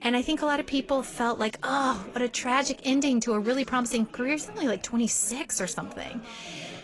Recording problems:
garbled, watery; slightly; nothing above 10.5 kHz
background chatter; faint; throughout; 3 voices, 20 dB below the speech

